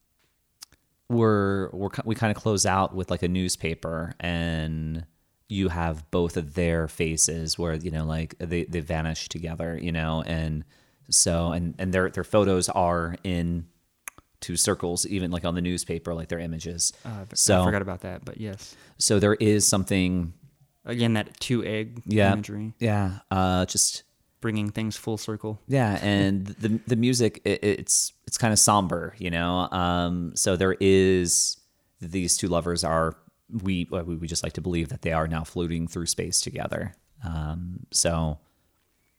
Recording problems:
none

